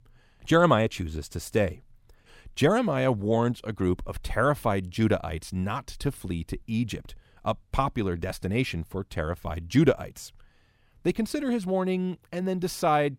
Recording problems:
none

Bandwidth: 16 kHz